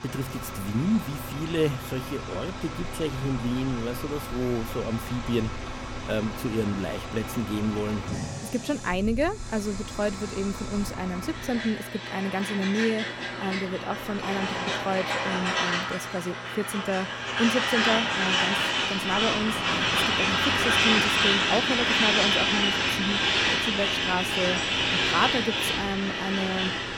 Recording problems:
traffic noise; very loud; throughout; 4 dB above the speech
electrical hum; faint; throughout; 60 Hz, 25 dB below the speech

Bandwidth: 18 kHz